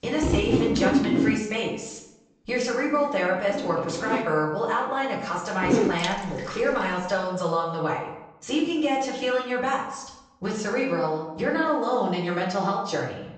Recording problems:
off-mic speech; far
room echo; noticeable; dies away in 0.7 s
high frequencies cut off; noticeable; nothing above 8 kHz
household noises; very faint; until 7 s; 1 dB above the speech

